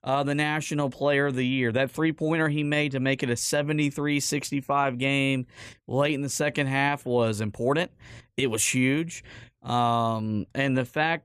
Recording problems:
none

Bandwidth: 14.5 kHz